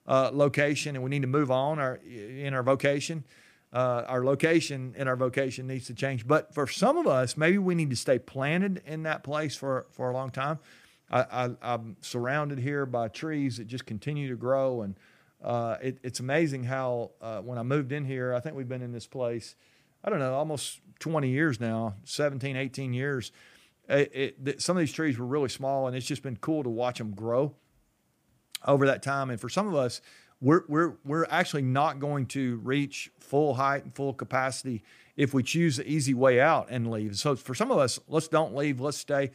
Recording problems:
none

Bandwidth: 15 kHz